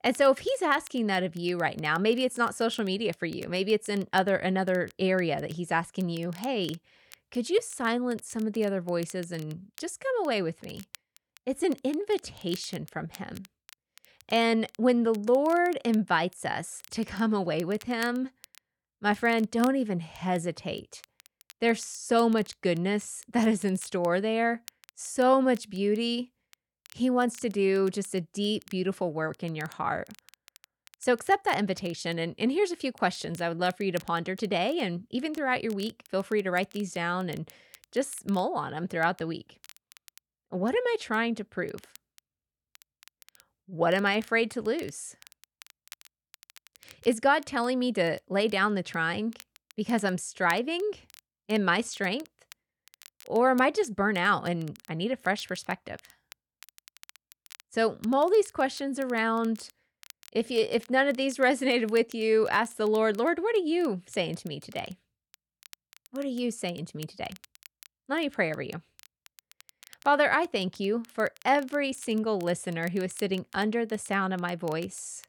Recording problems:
crackle, like an old record; faint; 25 dB below the speech

